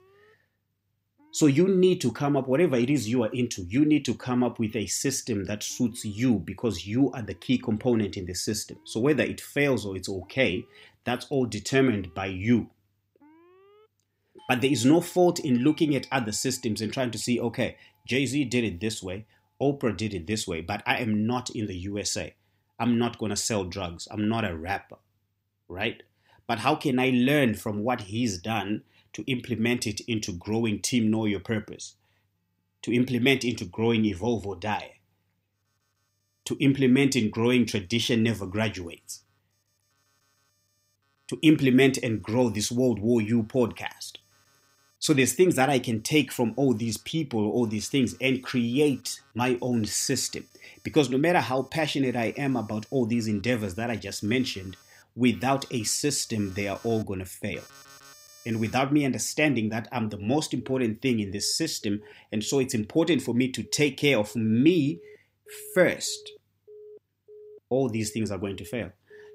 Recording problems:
alarms or sirens; faint; throughout; 30 dB below the speech

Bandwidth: 15.5 kHz